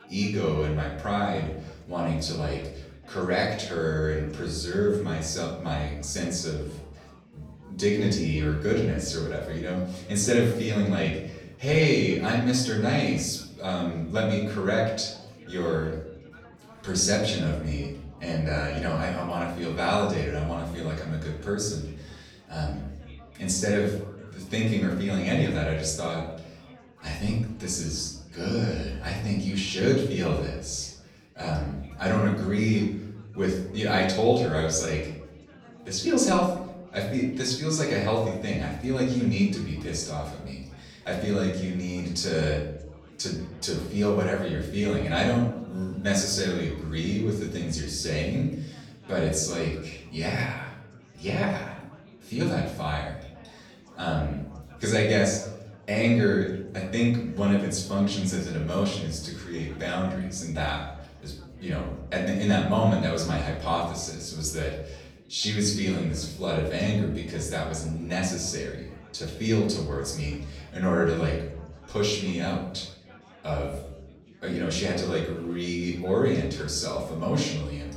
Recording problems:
off-mic speech; far
room echo; noticeable; dies away in 0.7 s
chatter from many people; faint; throughout; 25 dB below the speech

